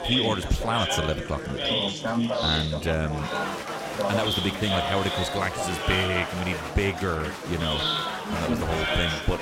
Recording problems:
chatter from many people; very loud; throughout; 1 dB above the speech
household noises; faint; throughout; 20 dB below the speech

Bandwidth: 16 kHz